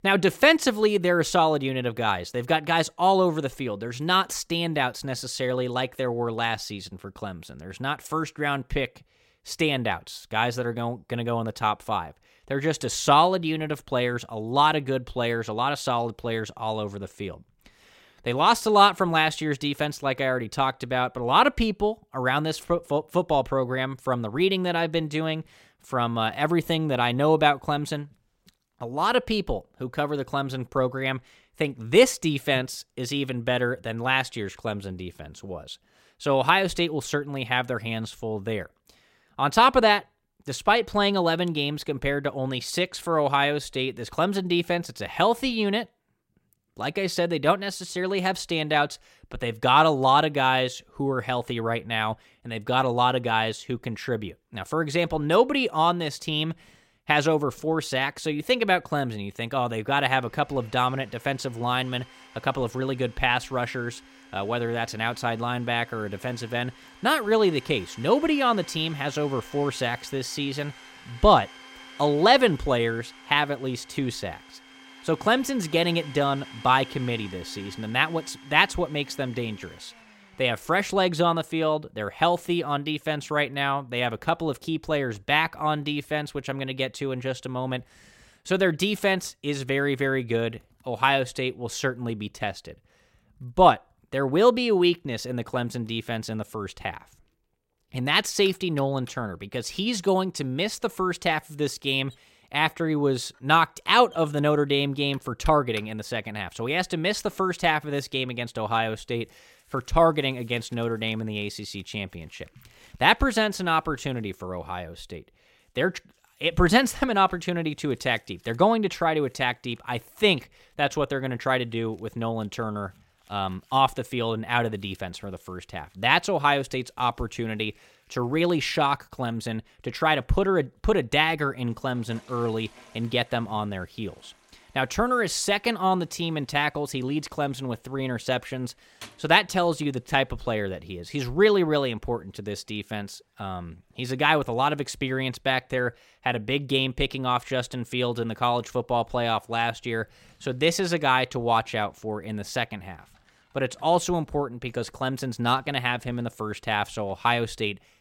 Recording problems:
household noises; faint; throughout; 25 dB below the speech

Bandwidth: 16 kHz